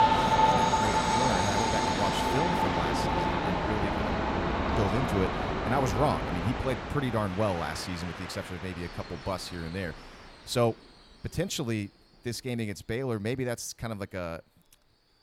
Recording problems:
train or aircraft noise; very loud; throughout; 4 dB above the speech

